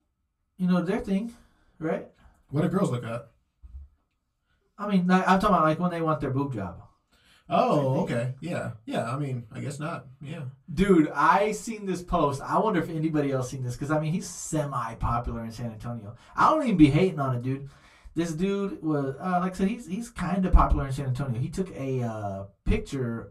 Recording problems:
off-mic speech; far
room echo; very slight; dies away in 0.2 s

